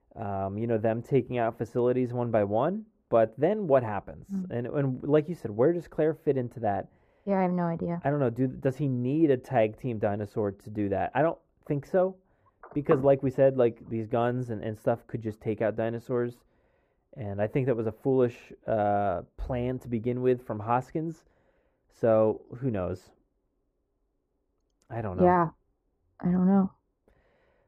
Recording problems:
muffled; very; fading above 2 kHz

